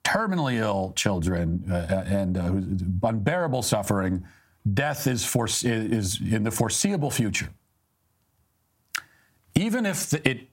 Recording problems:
squashed, flat; heavily

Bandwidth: 16 kHz